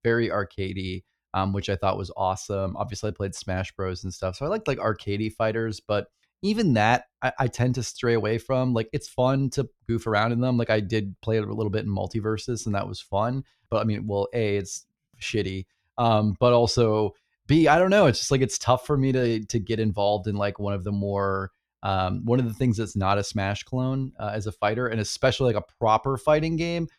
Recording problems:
none

